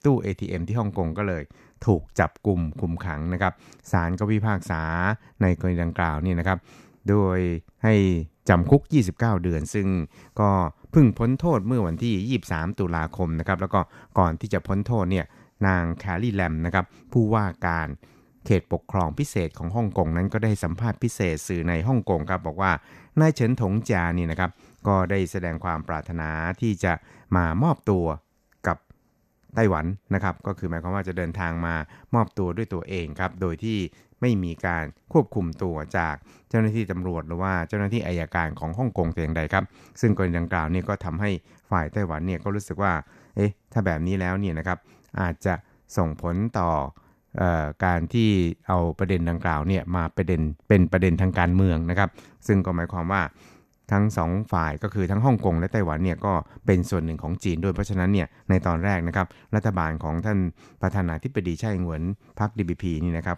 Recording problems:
none

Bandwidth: 14.5 kHz